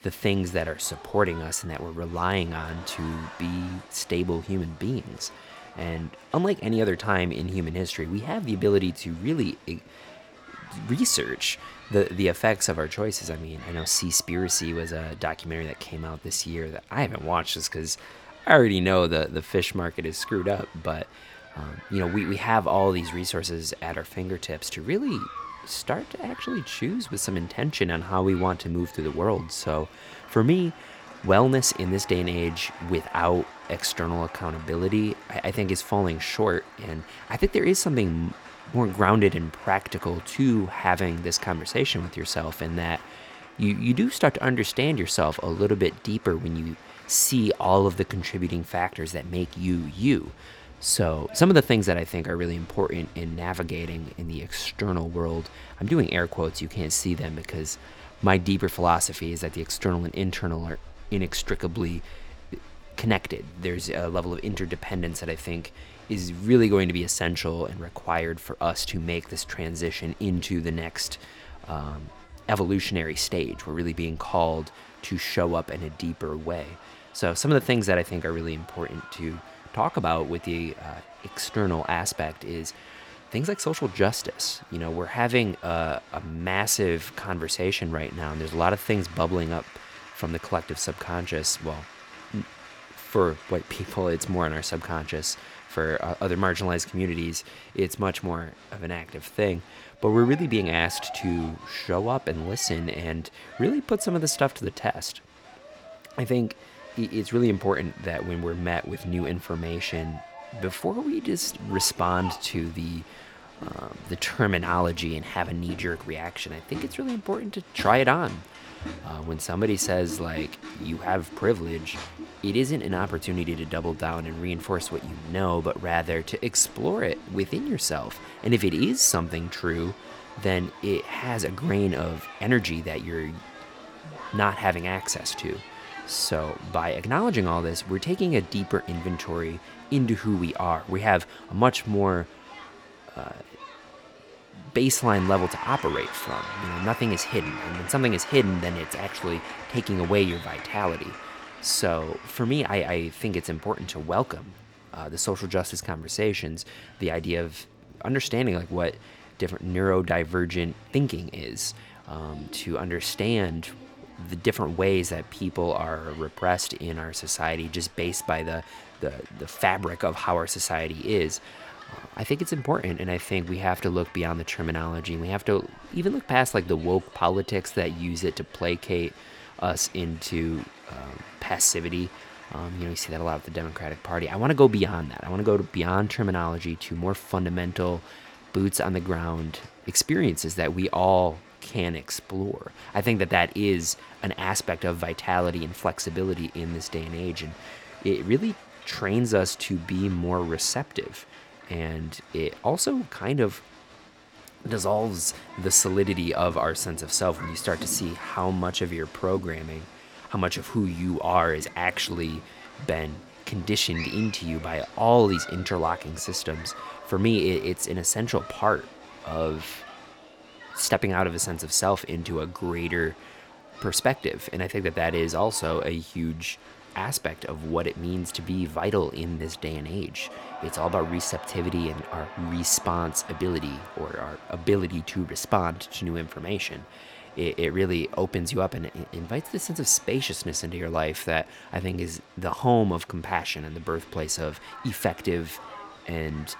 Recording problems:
crowd noise; noticeable; throughout; 15 dB below the speech

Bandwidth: 18.5 kHz